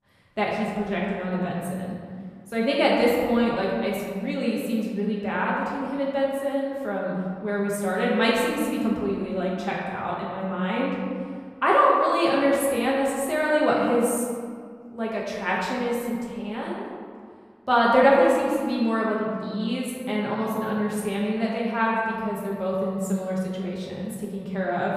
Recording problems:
off-mic speech; far
room echo; noticeable; dies away in 1.8 s

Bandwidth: 14.5 kHz